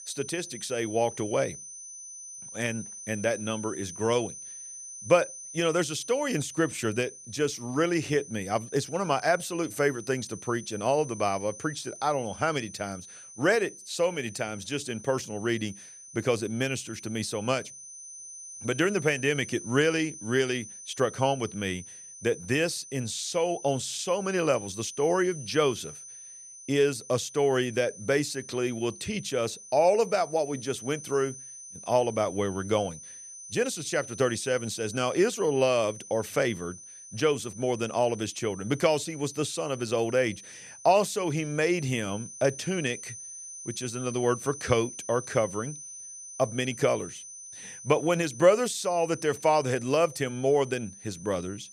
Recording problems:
high-pitched whine; noticeable; throughout; 6 kHz, 15 dB below the speech

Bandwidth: 14.5 kHz